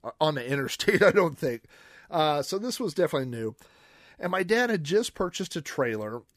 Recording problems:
none

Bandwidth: 15 kHz